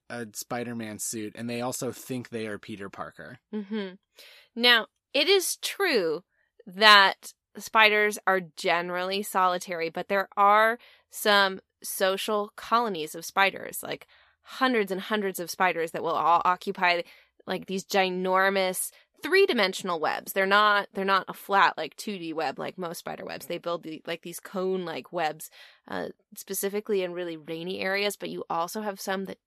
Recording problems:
none

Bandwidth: 14 kHz